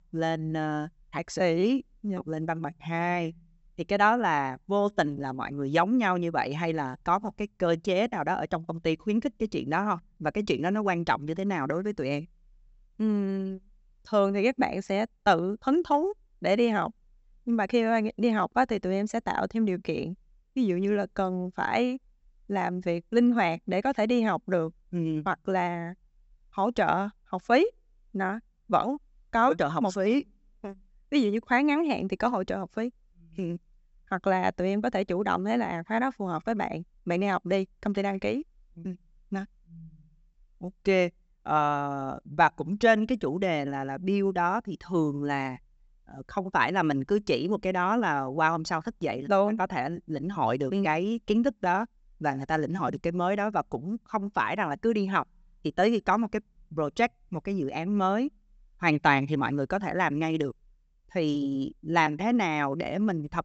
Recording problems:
high frequencies cut off; noticeable; nothing above 8 kHz

